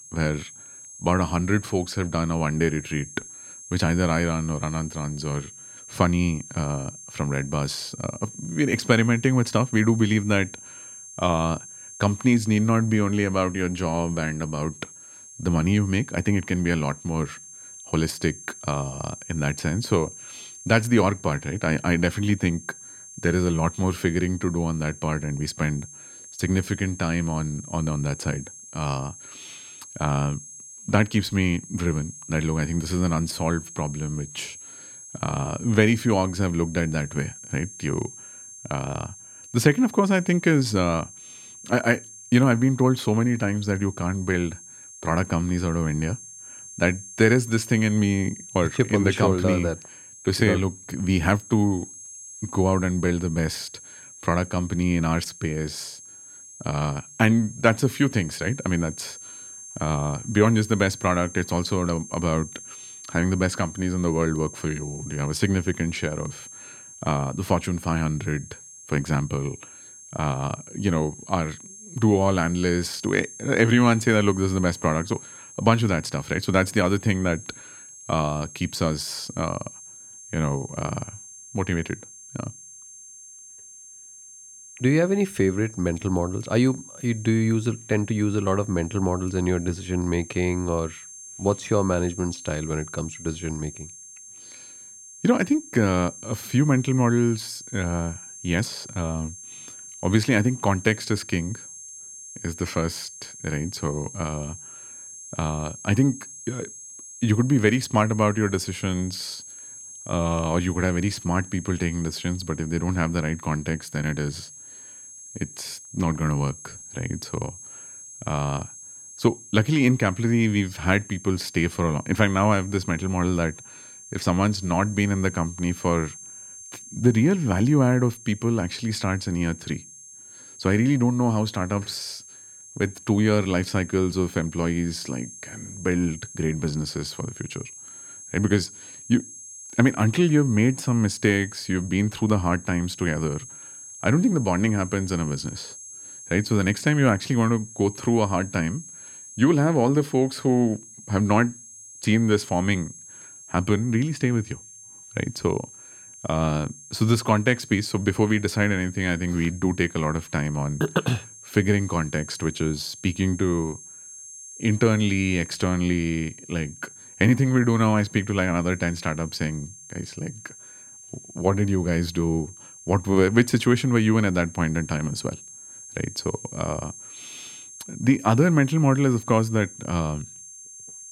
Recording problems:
high-pitched whine; noticeable; throughout; 6.5 kHz, 15 dB below the speech

